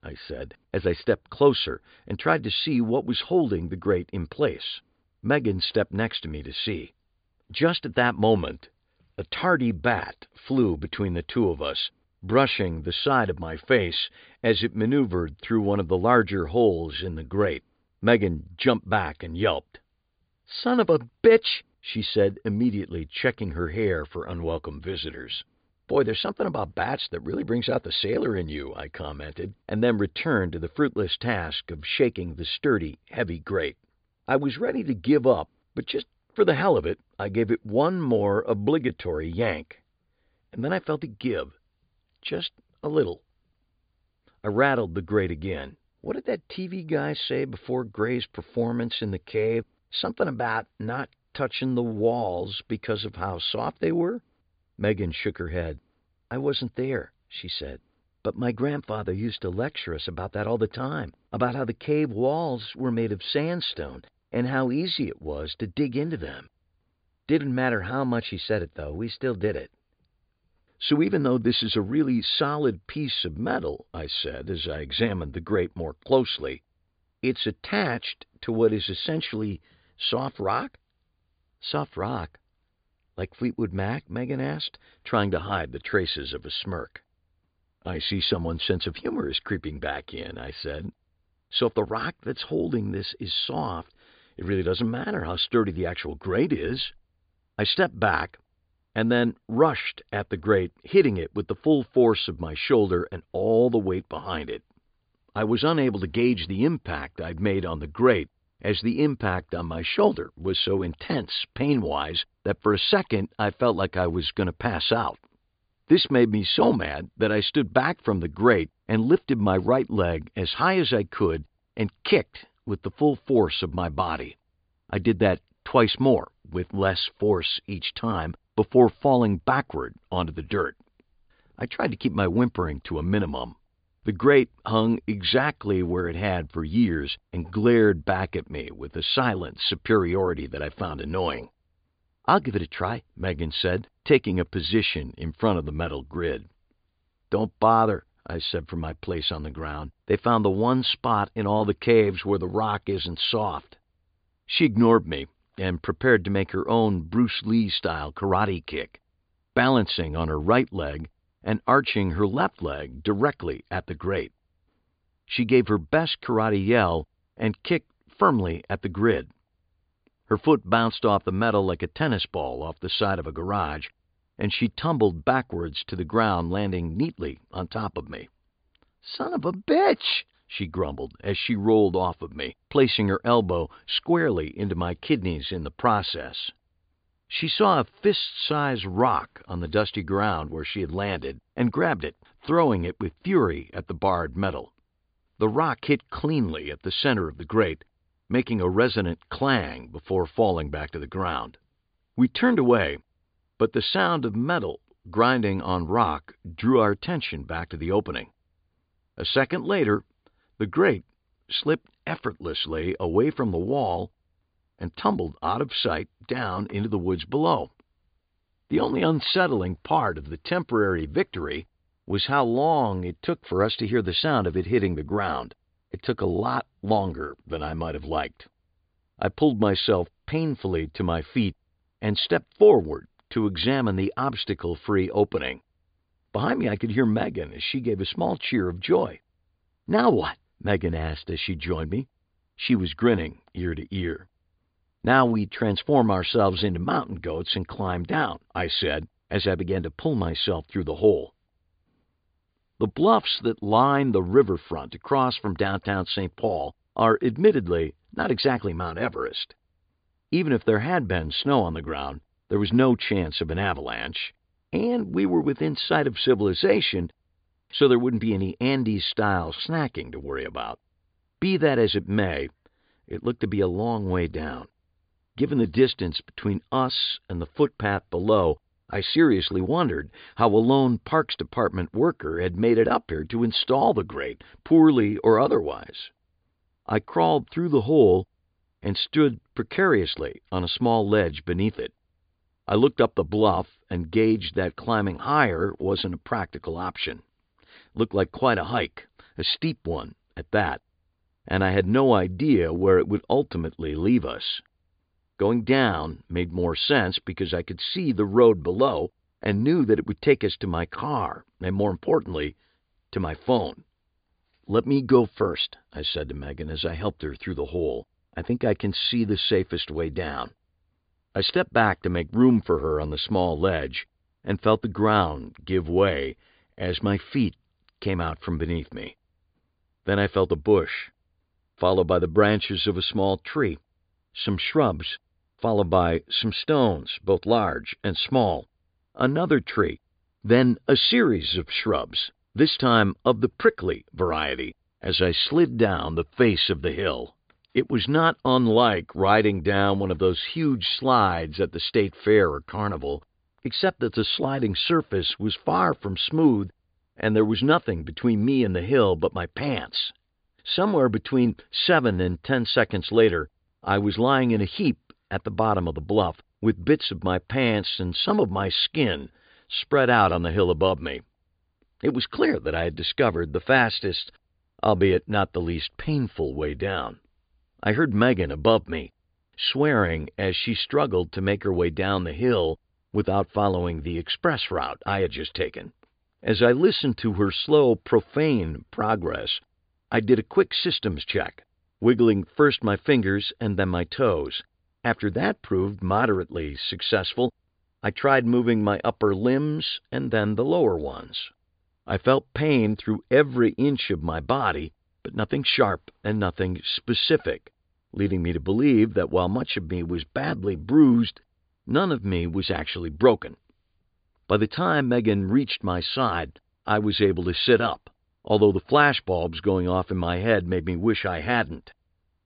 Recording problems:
high frequencies cut off; severe; nothing above 5 kHz

